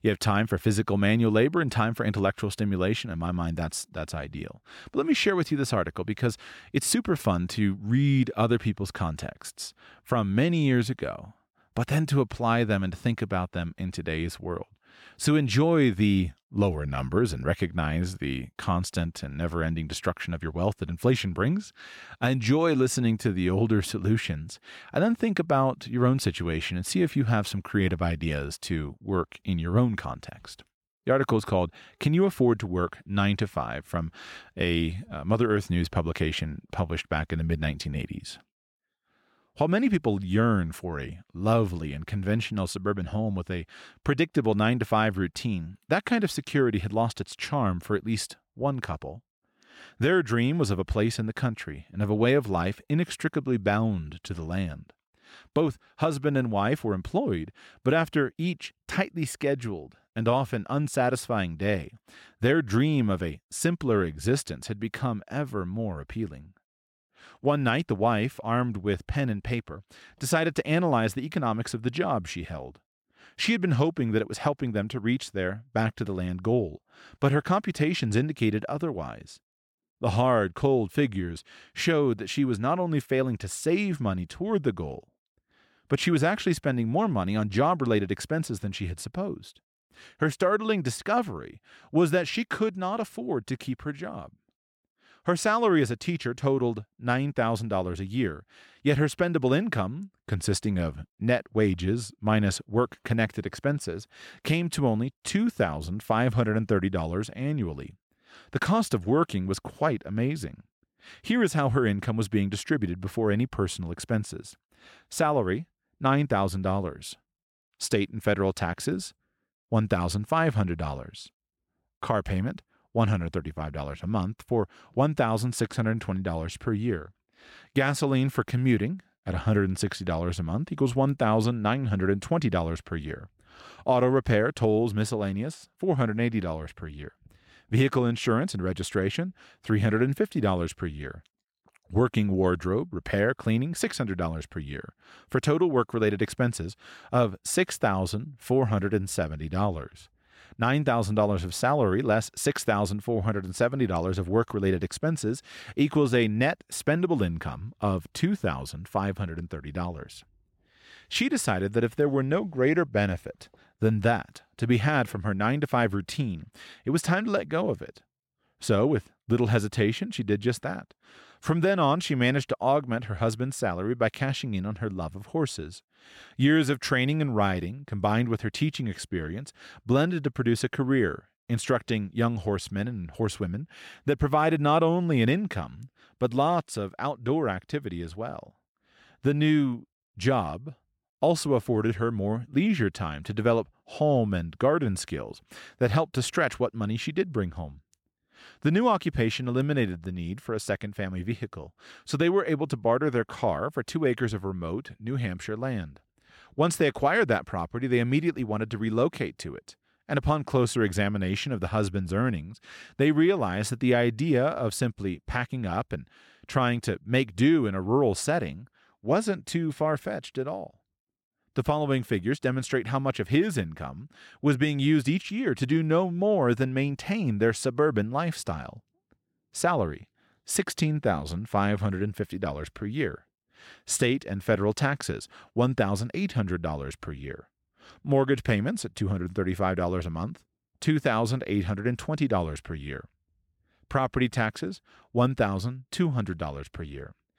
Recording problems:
none

